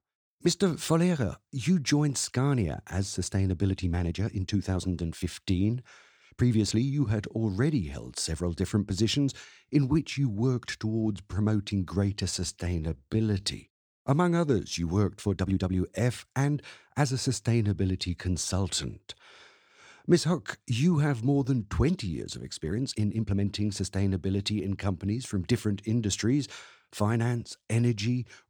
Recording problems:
uneven, jittery; strongly; from 3.5 to 23 s

